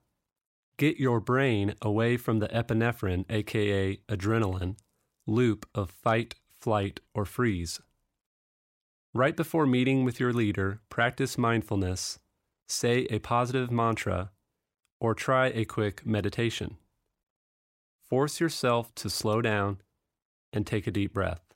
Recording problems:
none

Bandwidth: 16 kHz